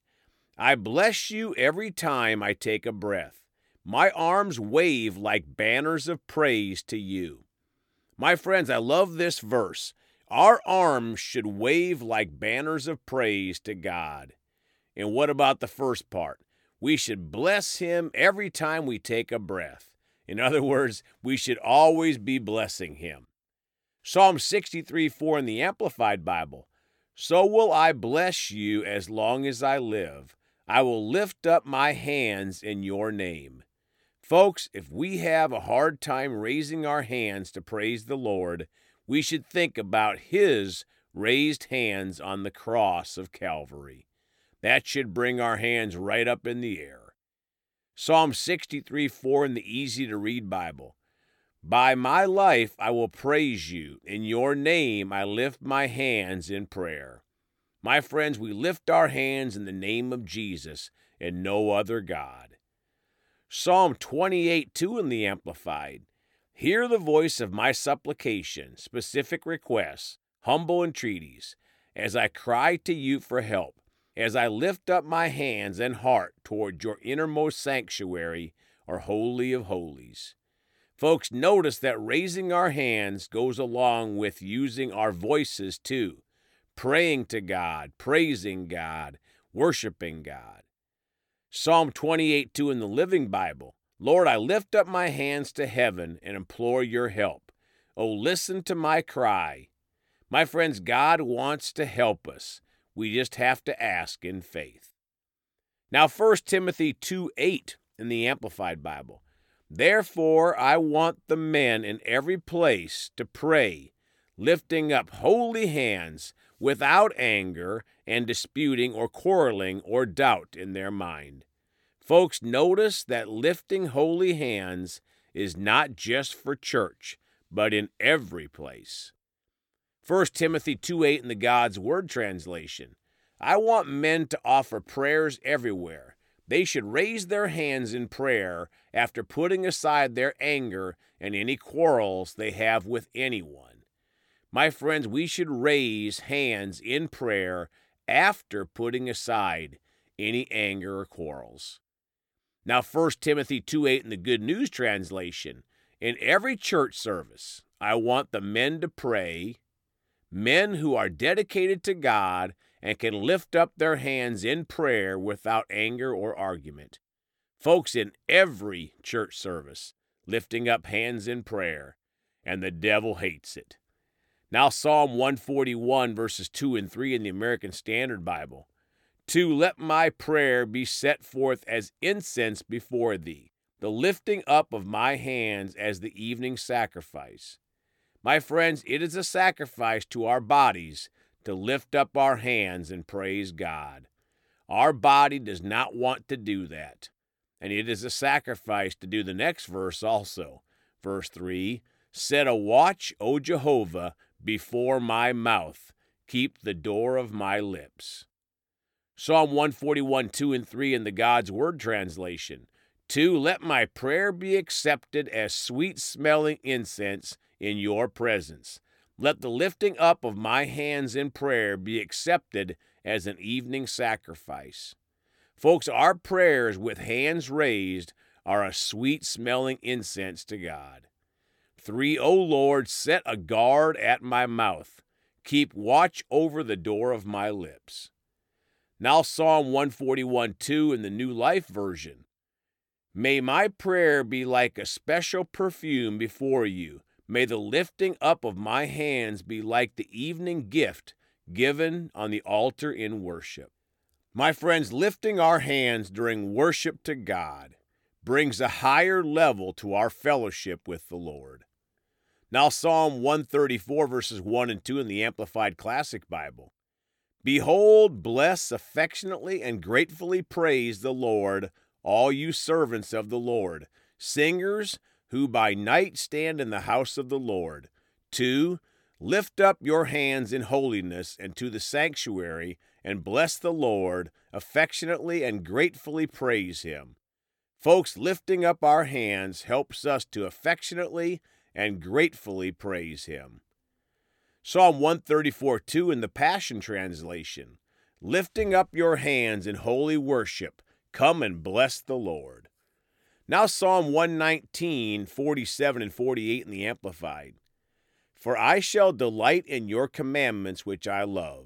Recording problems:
none

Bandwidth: 18 kHz